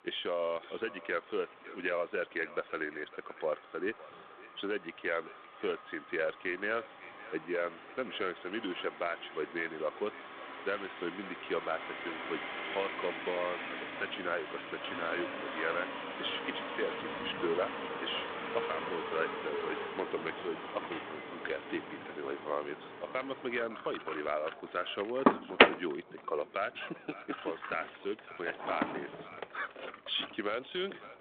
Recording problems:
echo of what is said; noticeable; throughout; 560 ms later, 15 dB below the speech
phone-call audio
traffic noise; very loud; throughout; as loud as the speech

